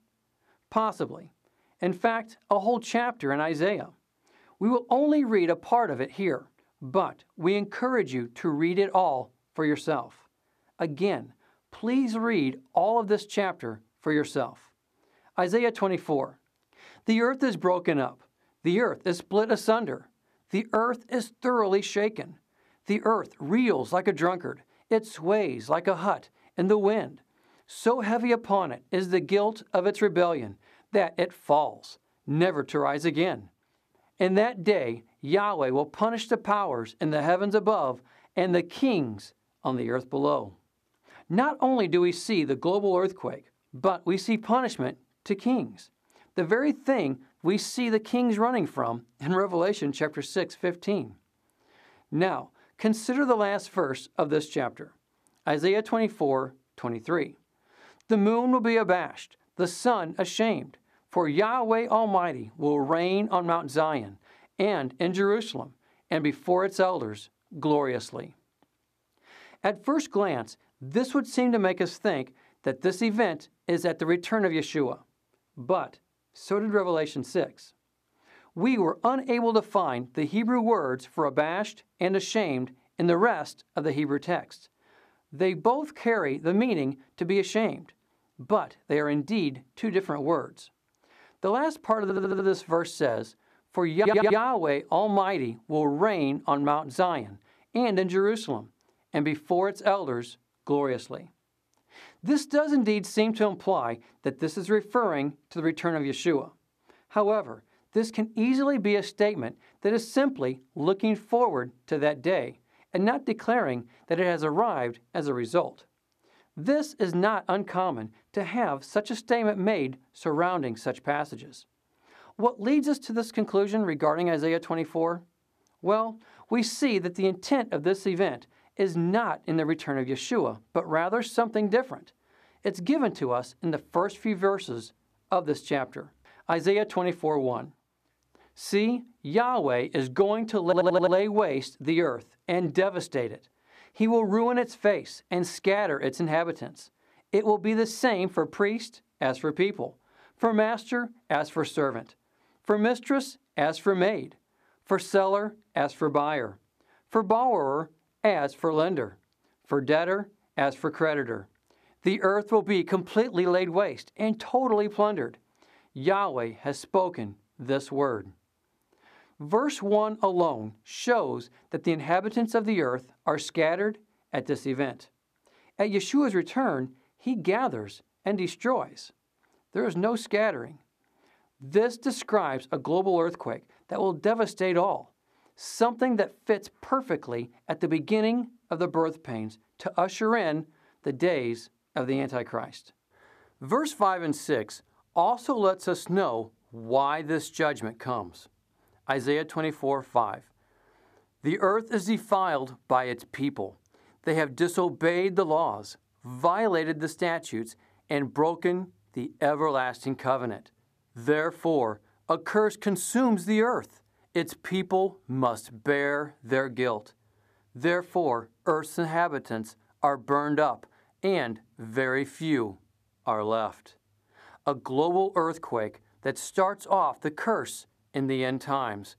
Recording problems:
audio stuttering; at 1:32, at 1:34 and at 2:21

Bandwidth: 14.5 kHz